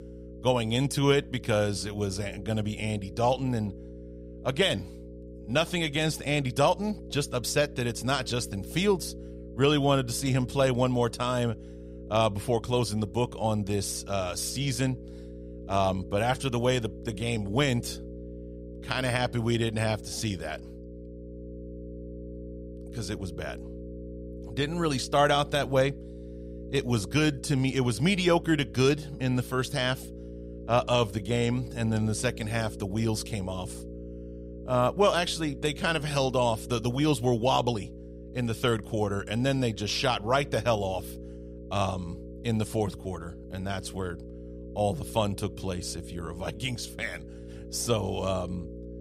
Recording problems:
electrical hum; noticeable; throughout; 60 Hz, 20 dB below the speech

